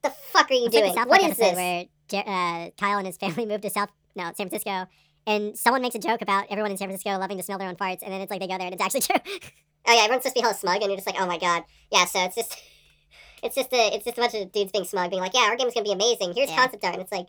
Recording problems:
wrong speed and pitch; too fast and too high; 1.5 times normal speed

